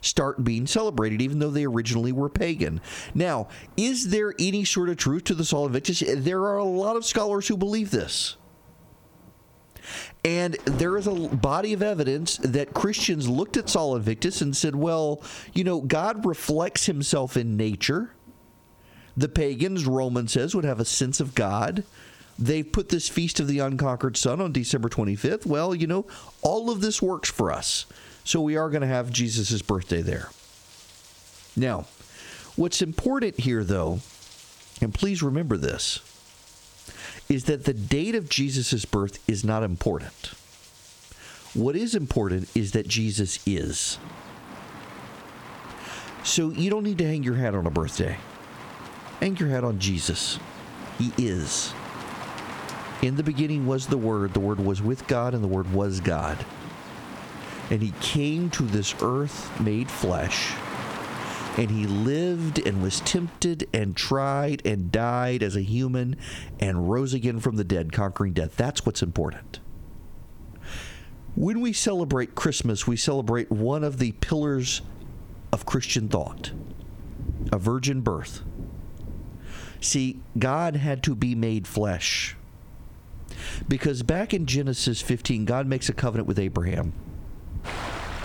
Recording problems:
squashed, flat; heavily, background pumping
rain or running water; noticeable; throughout; 15 dB below the speech

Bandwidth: 18.5 kHz